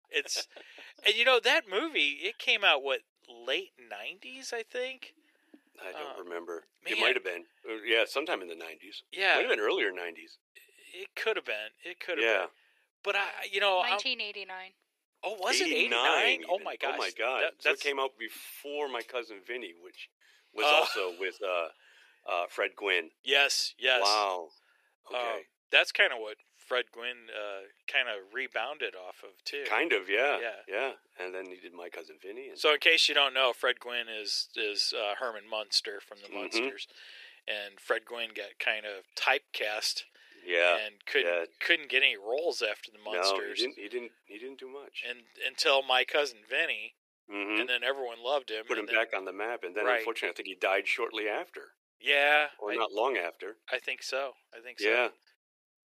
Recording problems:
thin; very; fading below 400 Hz

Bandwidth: 14.5 kHz